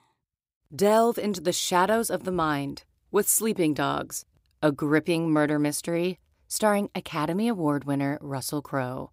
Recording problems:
none

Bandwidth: 15.5 kHz